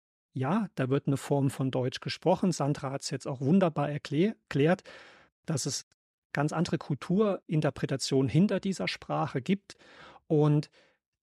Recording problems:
none

